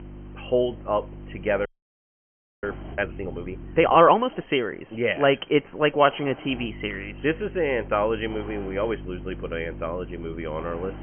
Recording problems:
high frequencies cut off; severe; nothing above 3 kHz
electrical hum; faint; until 4 s and from 6.5 s on; 50 Hz, 25 dB below the speech
hiss; faint; throughout; 25 dB below the speech
audio freezing; at 1.5 s for 1 s

